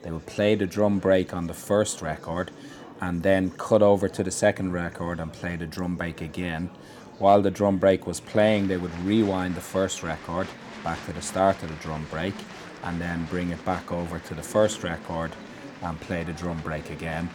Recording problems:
murmuring crowd; noticeable; throughout; 15 dB below the speech

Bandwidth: 18 kHz